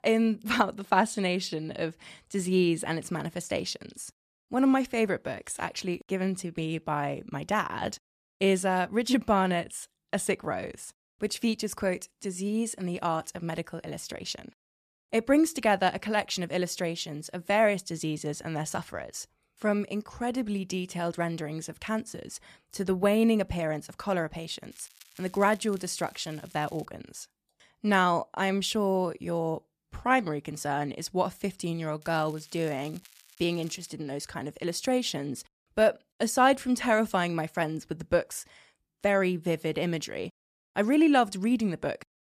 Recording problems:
crackling; faint; from 25 to 27 s and from 32 to 34 s; 25 dB below the speech

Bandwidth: 14.5 kHz